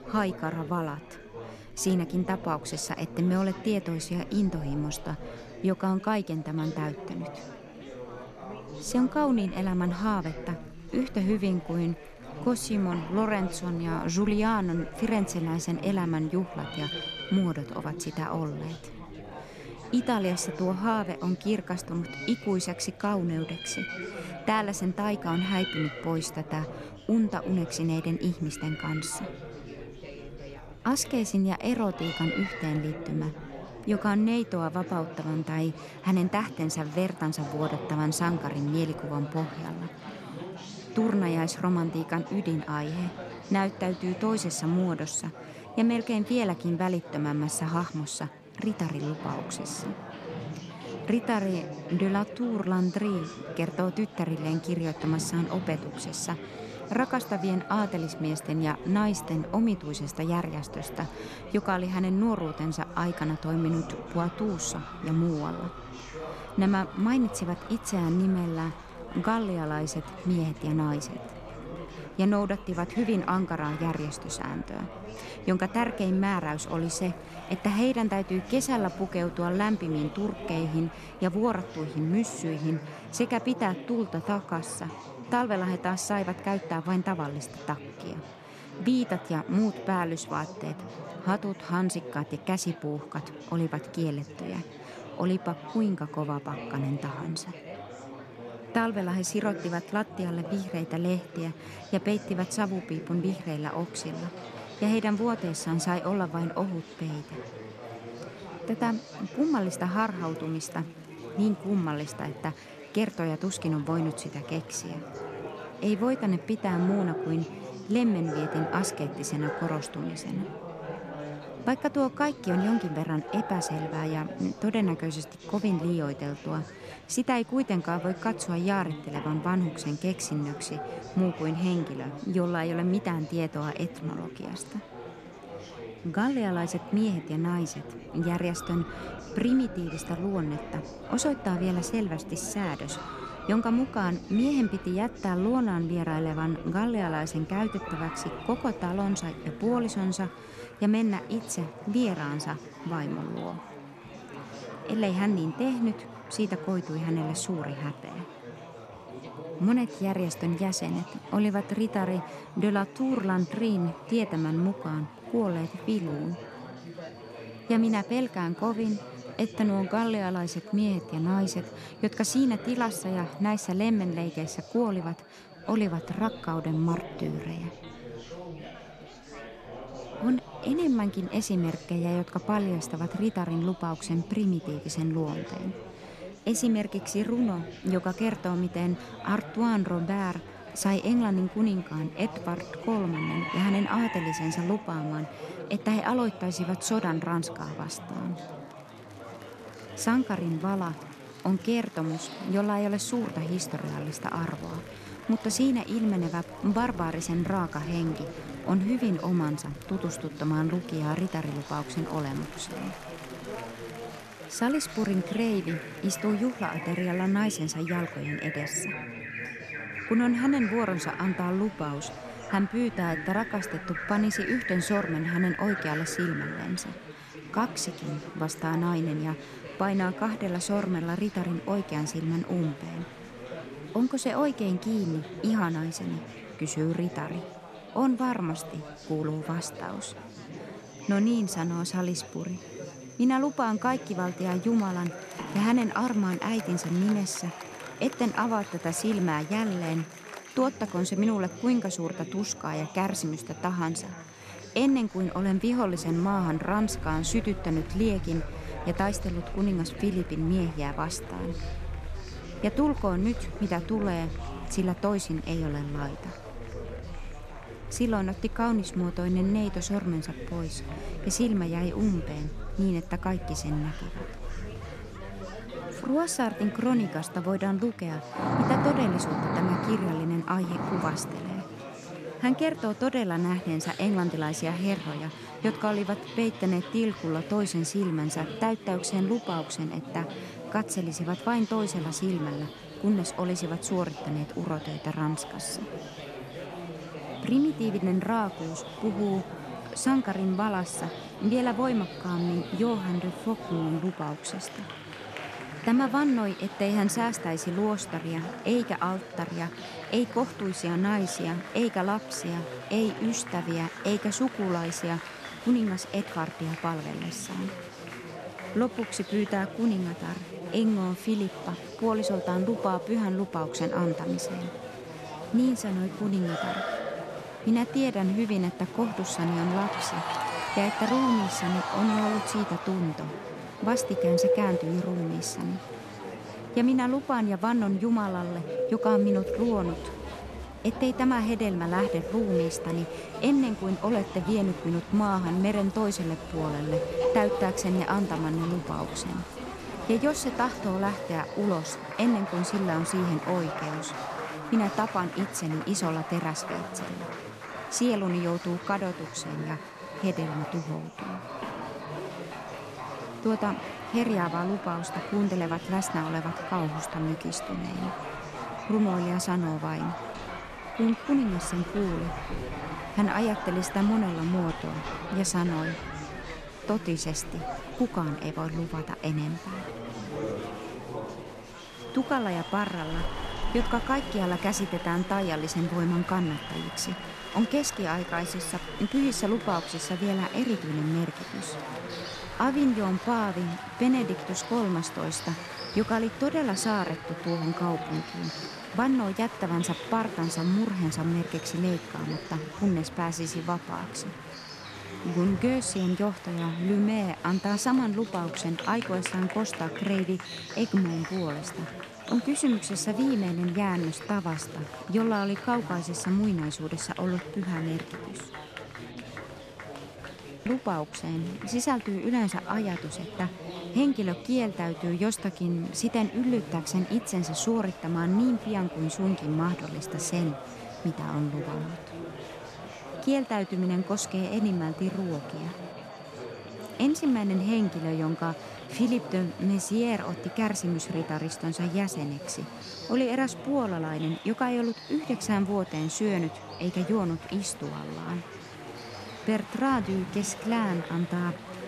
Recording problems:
animal sounds; noticeable; throughout; 10 dB below the speech
chatter from many people; noticeable; throughout; 10 dB below the speech

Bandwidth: 13.5 kHz